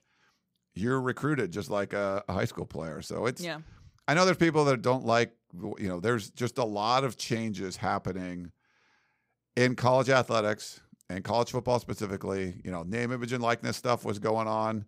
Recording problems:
none

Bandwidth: 15.5 kHz